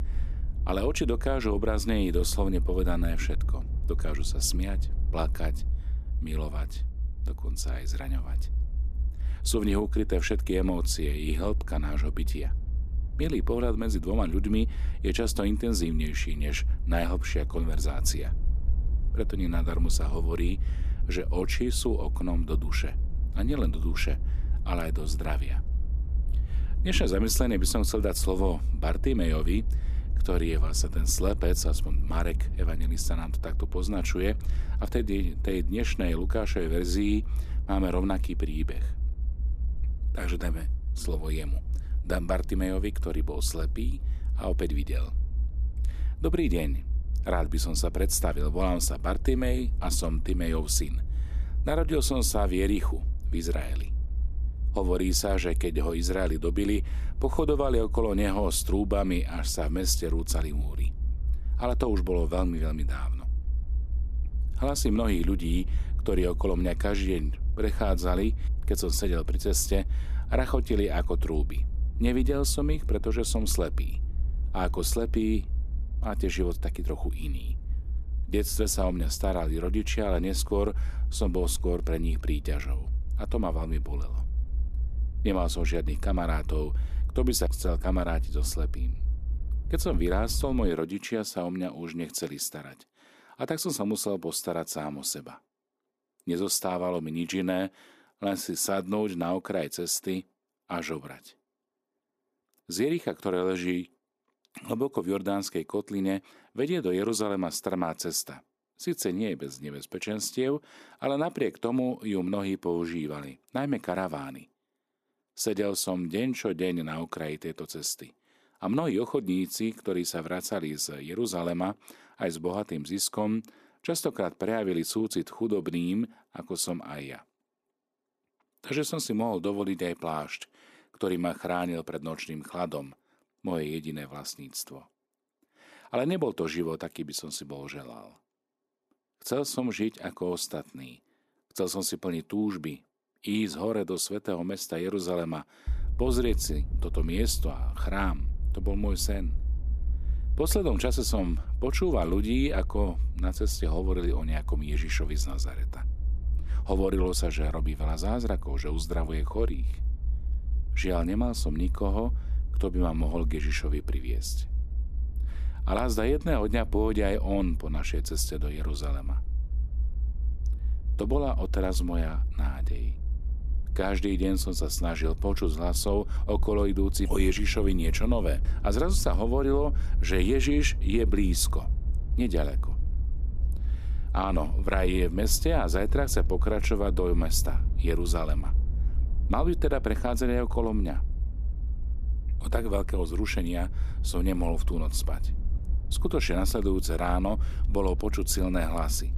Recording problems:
low rumble; noticeable; until 1:31 and from 2:26 on; 20 dB below the speech

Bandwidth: 14.5 kHz